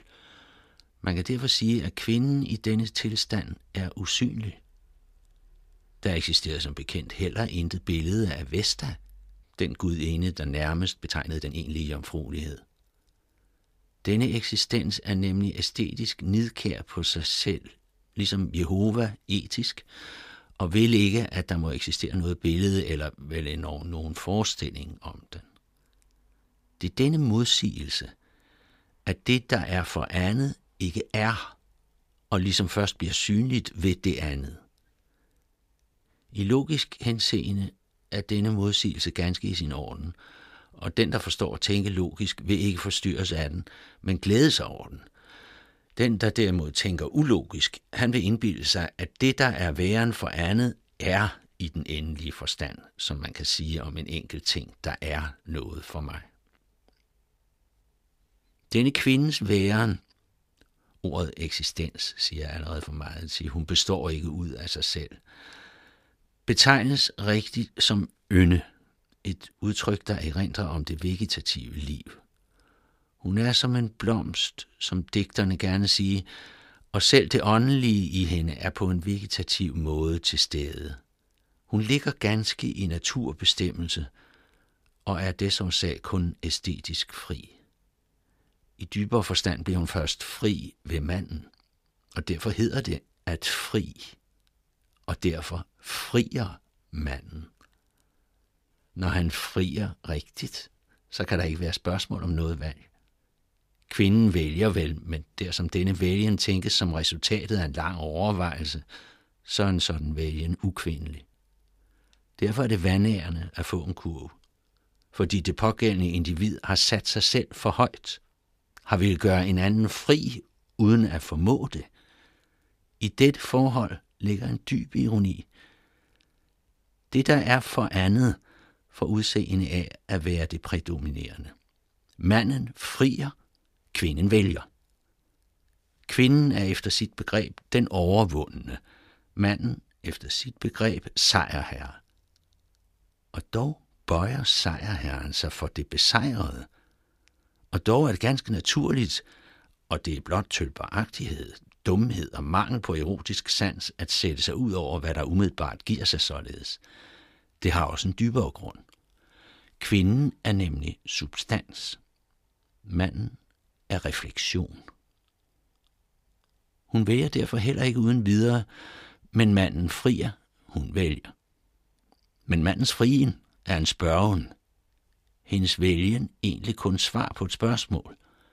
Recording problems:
uneven, jittery; strongly; from 11 s to 2:54

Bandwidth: 15 kHz